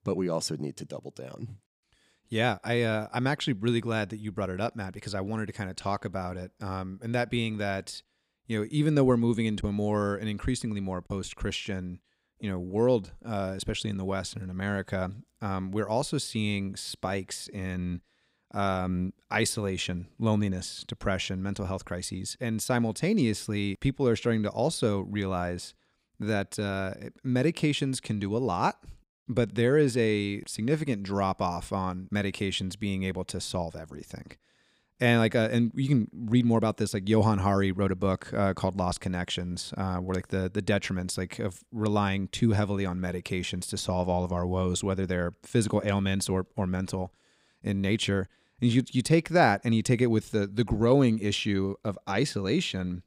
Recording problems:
none

